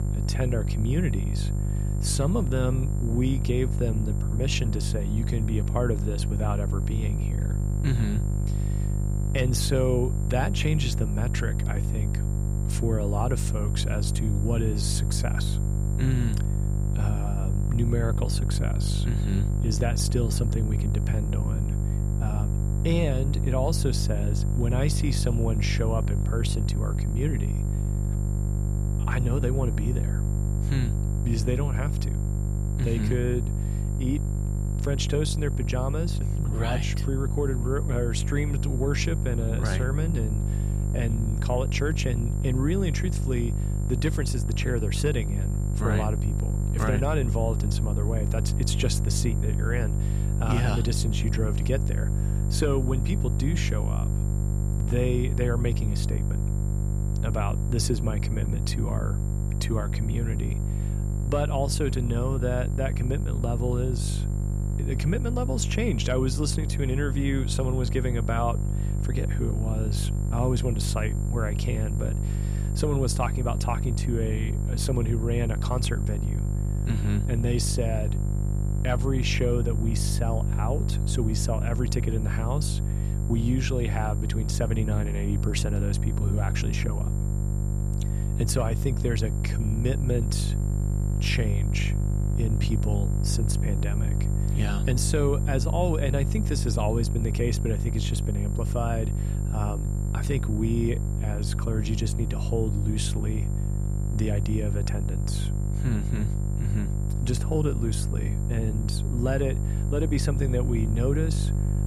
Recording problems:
electrical hum; loud; throughout; 50 Hz, 7 dB below the speech
high-pitched whine; noticeable; throughout; 7.5 kHz, 15 dB below the speech

